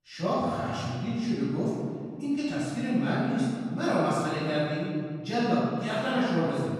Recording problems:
room echo; strong; dies away in 1.8 s
off-mic speech; far

